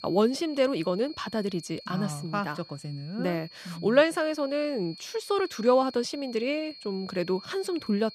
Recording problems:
high-pitched whine; noticeable; throughout; 4.5 kHz, 15 dB below the speech

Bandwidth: 14.5 kHz